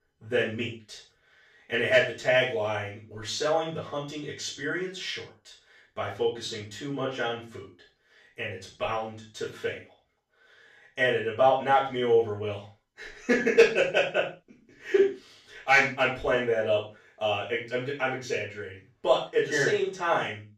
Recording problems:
off-mic speech; far
room echo; noticeable; dies away in 0.3 s

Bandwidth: 14.5 kHz